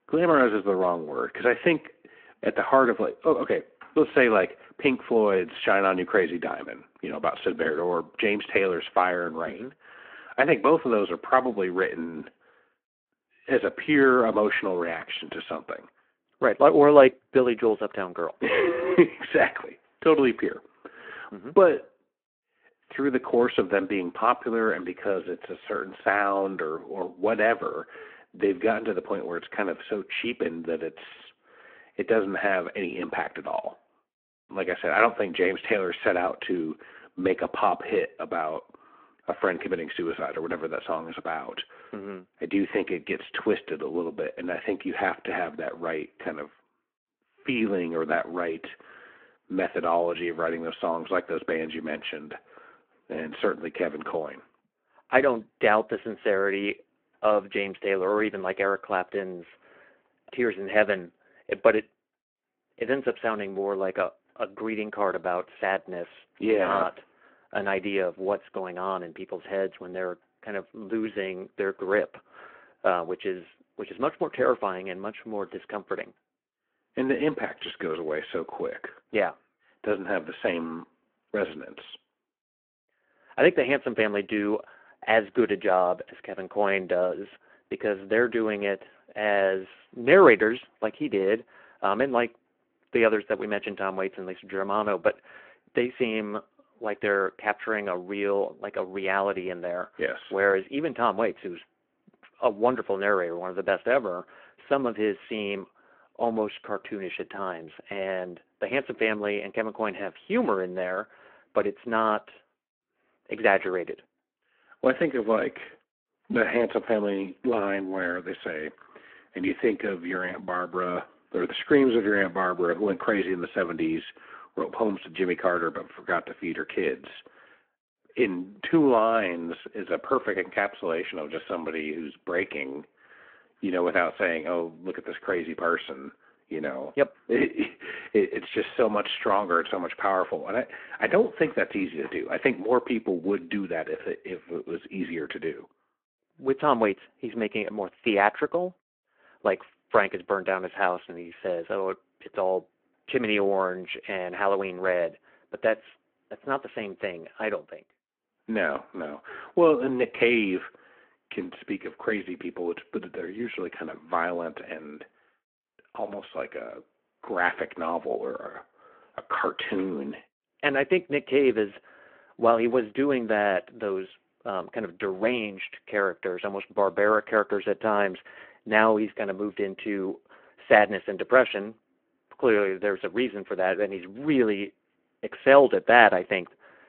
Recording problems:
phone-call audio

